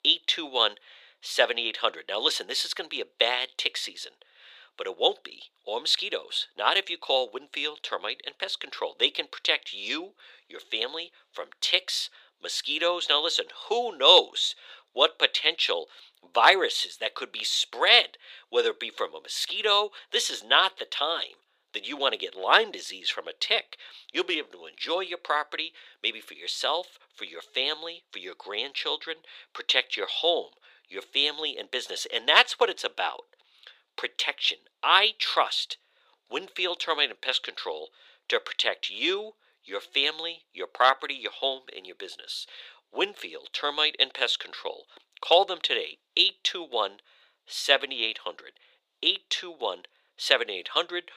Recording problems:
thin; very; fading below 450 Hz

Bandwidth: 15 kHz